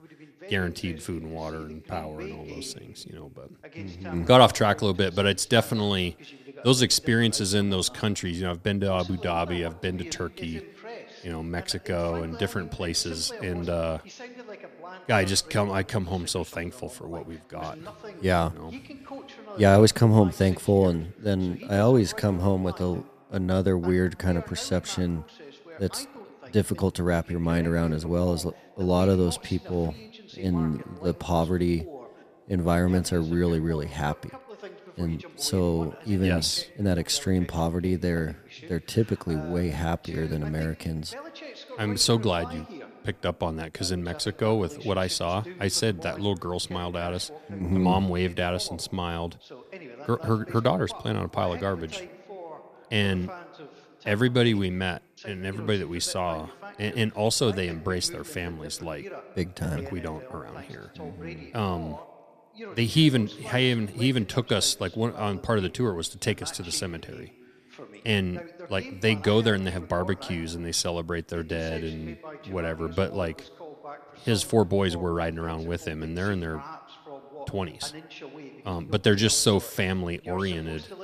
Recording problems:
voice in the background; noticeable; throughout; 20 dB below the speech

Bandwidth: 14.5 kHz